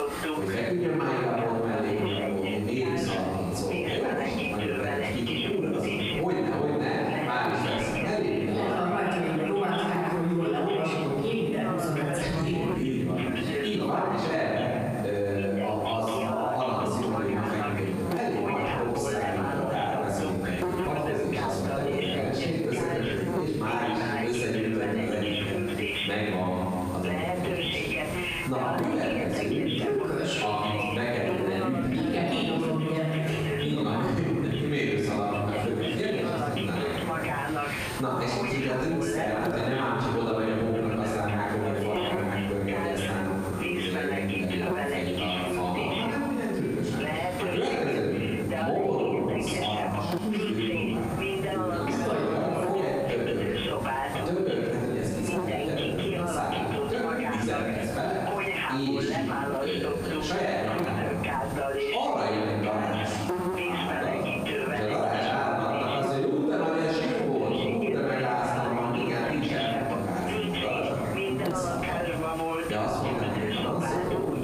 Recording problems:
room echo; strong; dies away in 1.5 s
off-mic speech; far
squashed, flat; somewhat
voice in the background; loud; throughout; 5 dB below the speech
electrical hum; noticeable; throughout; 50 Hz, 10 dB below the speech

